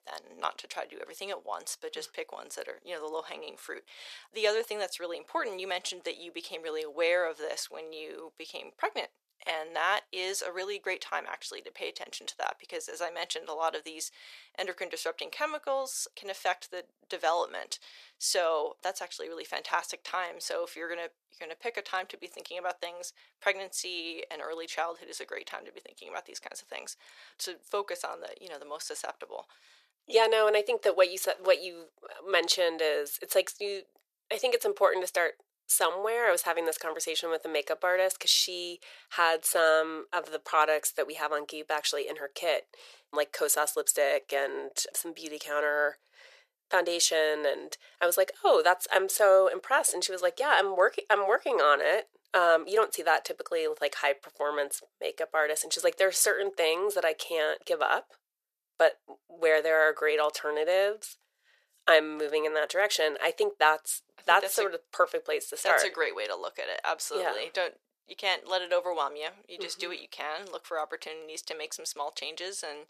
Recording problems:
thin; very; fading below 450 Hz

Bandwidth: 14.5 kHz